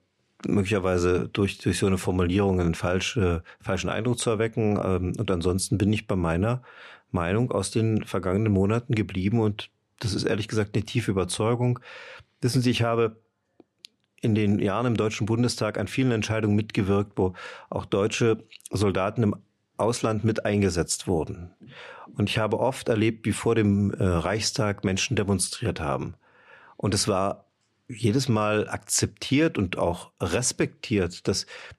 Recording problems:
none

